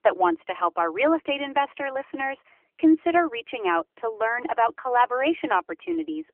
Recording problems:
phone-call audio; nothing above 3 kHz

